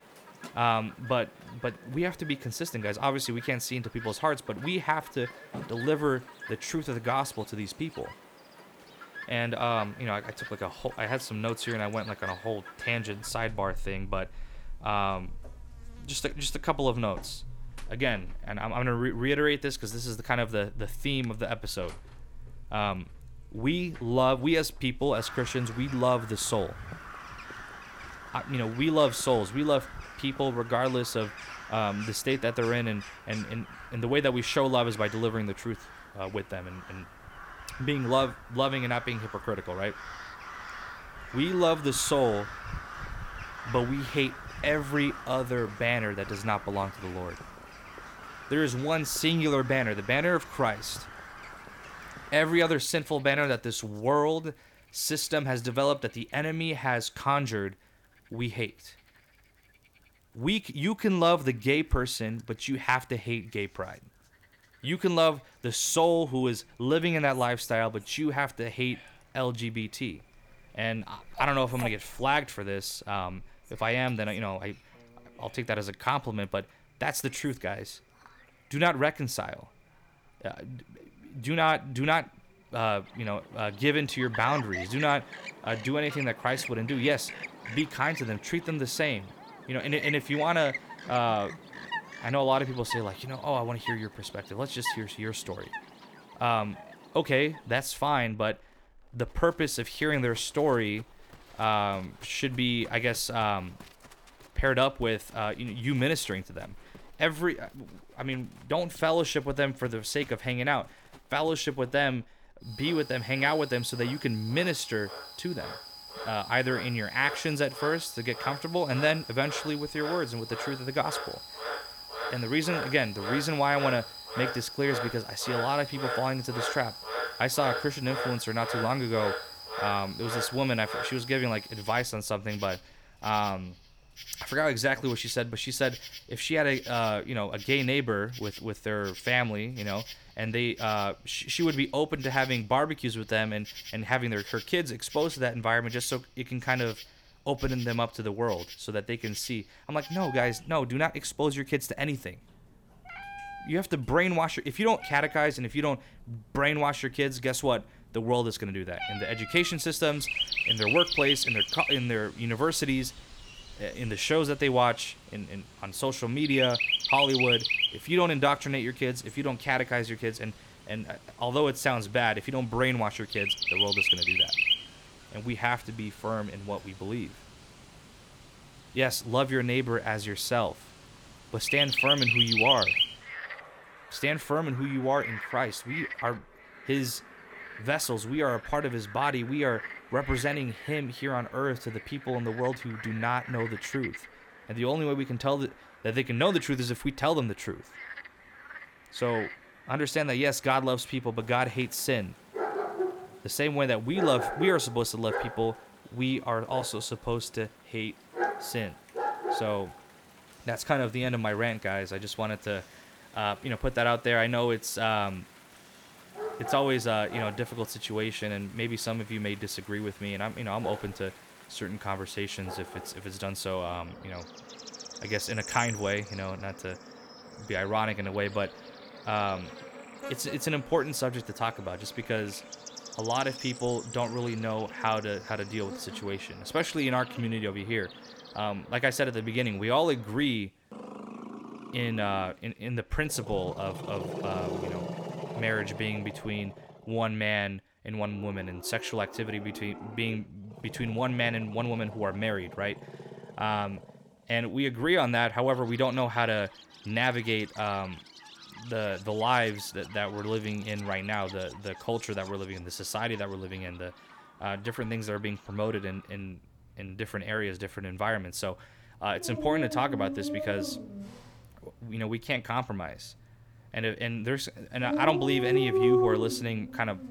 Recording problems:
animal sounds; loud; throughout; 6 dB below the speech

